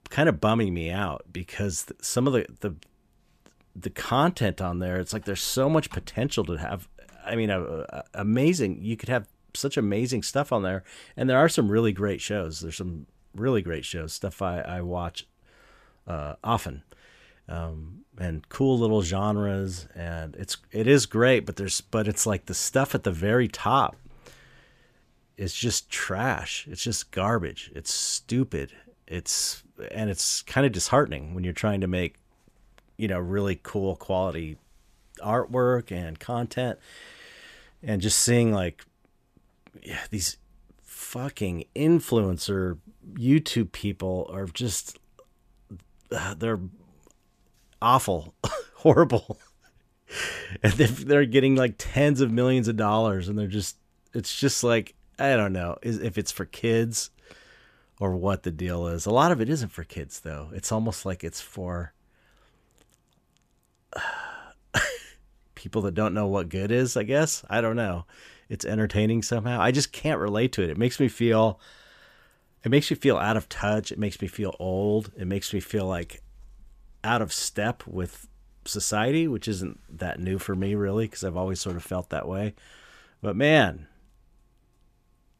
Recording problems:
none

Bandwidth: 14.5 kHz